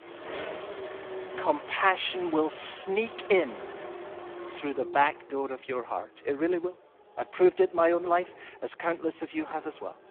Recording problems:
phone-call audio; poor line; nothing above 3.5 kHz
traffic noise; noticeable; throughout; 15 dB below the speech

